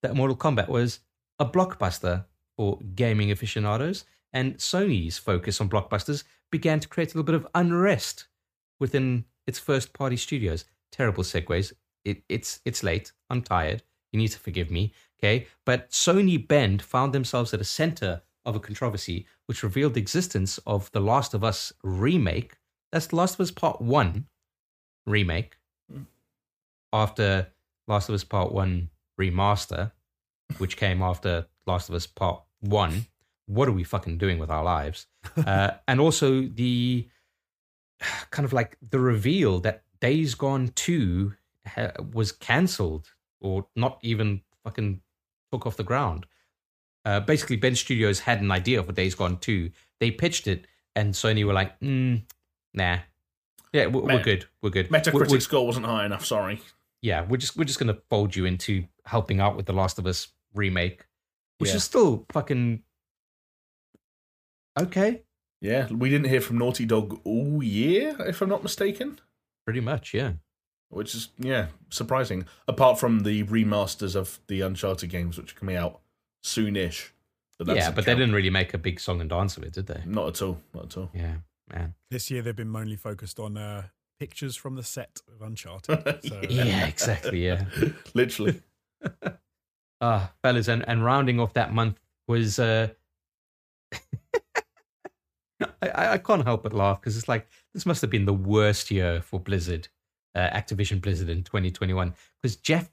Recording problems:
none

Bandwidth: 15 kHz